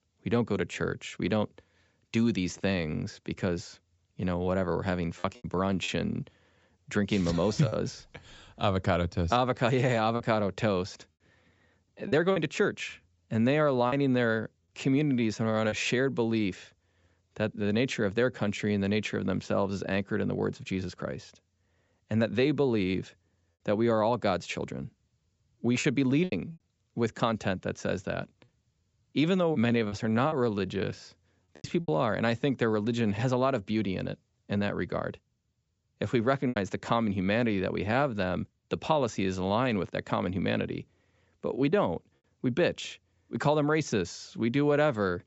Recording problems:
high frequencies cut off; noticeable; nothing above 7.5 kHz
choppy; occasionally; 2% of the speech affected

